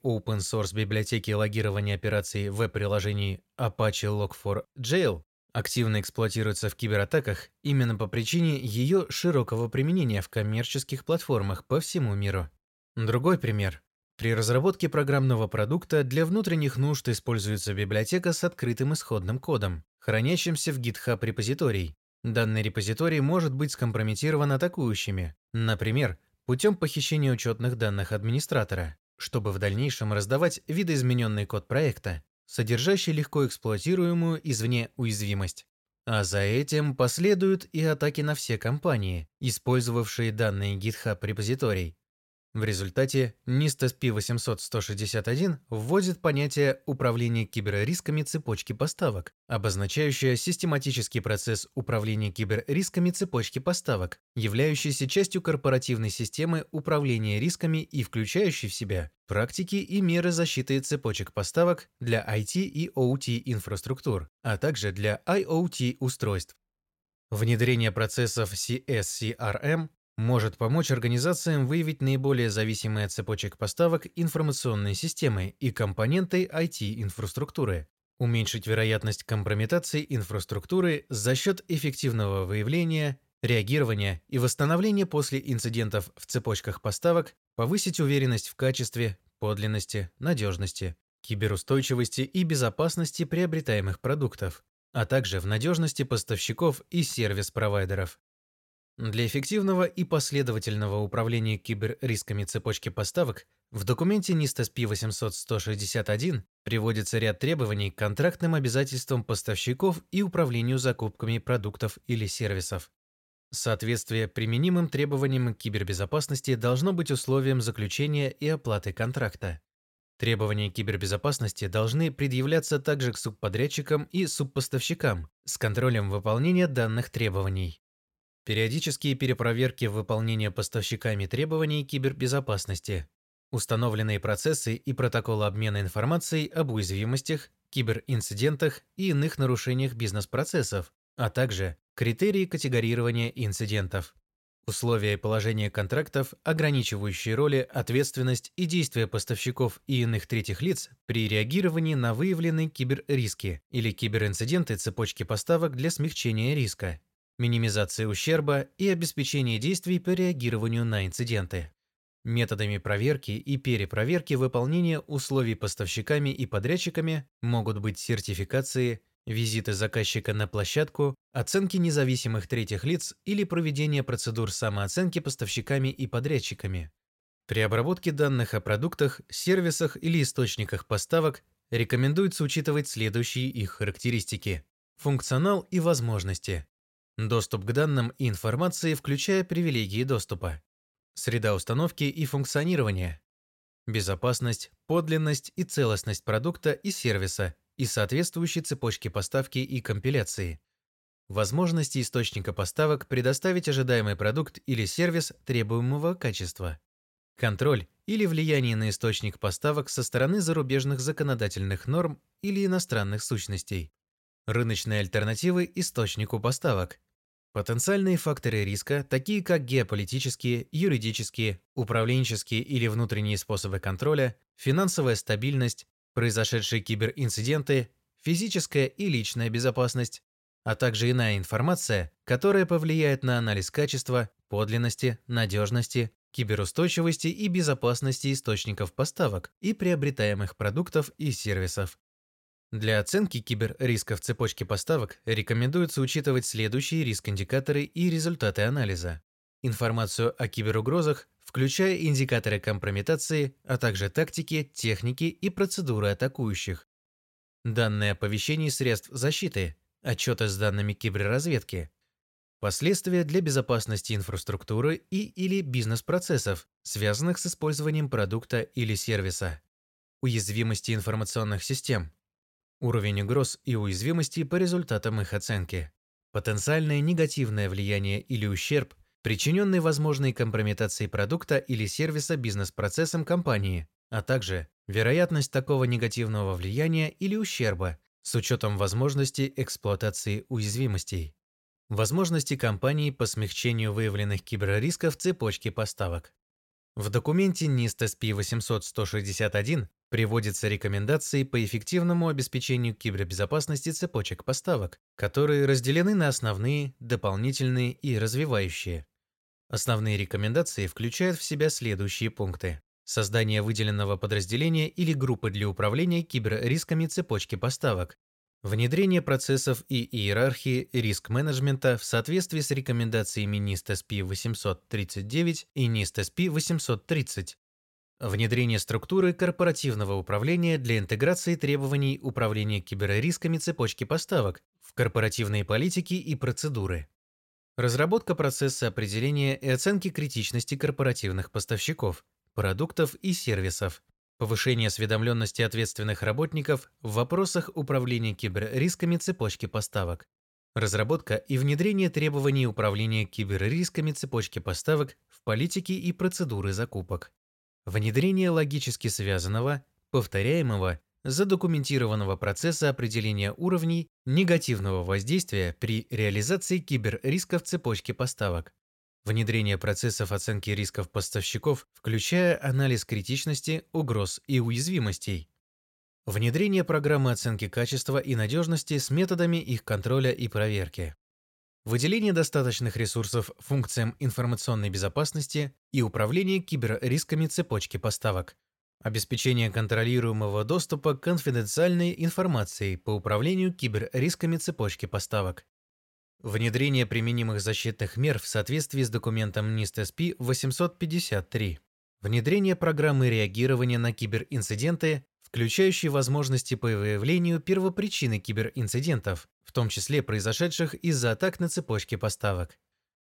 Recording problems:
none

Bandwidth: 16.5 kHz